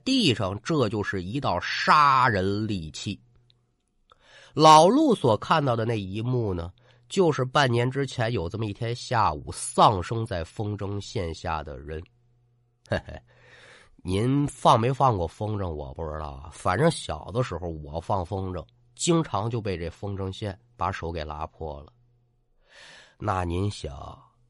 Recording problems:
none

